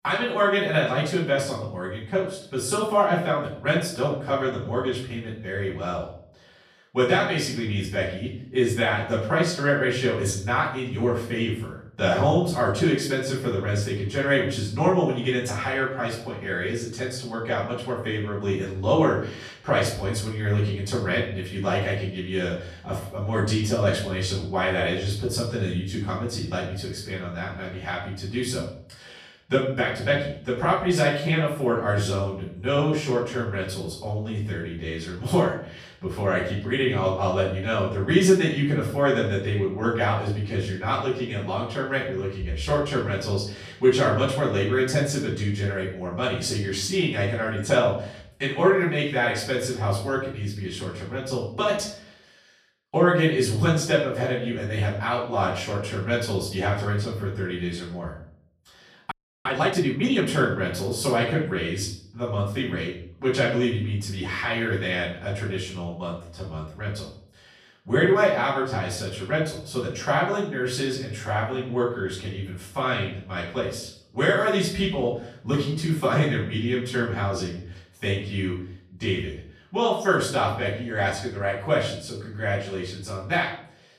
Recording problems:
off-mic speech; far
room echo; noticeable; dies away in 0.6 s
audio freezing; at 59 s

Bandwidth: 14.5 kHz